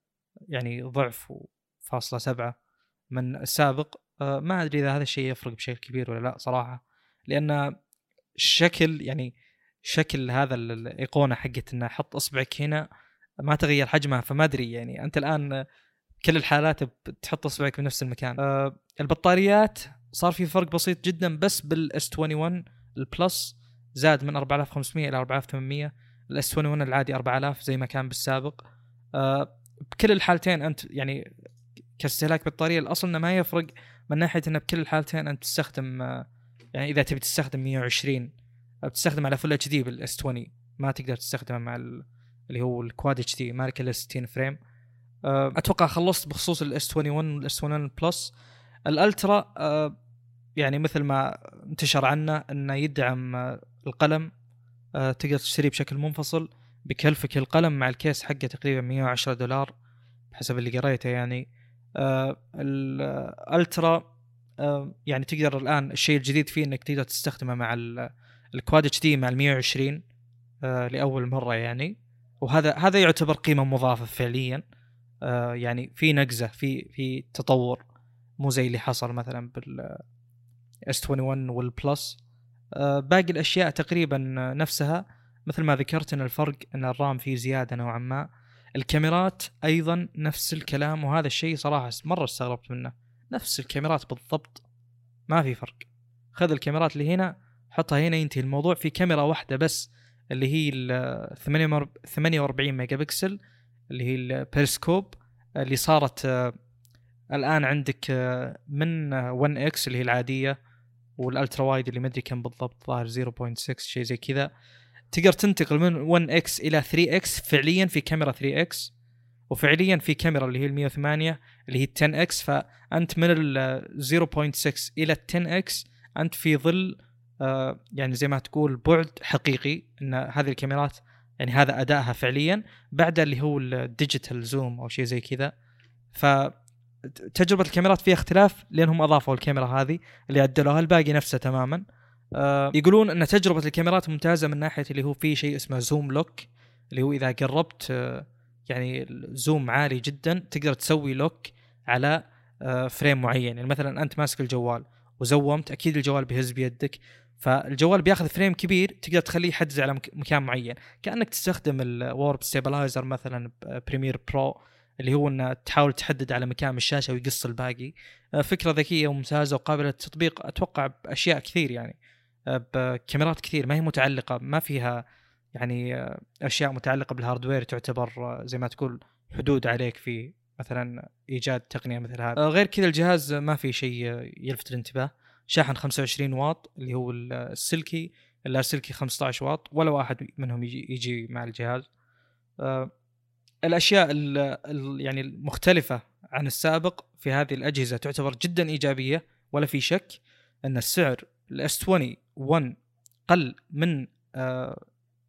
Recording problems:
none

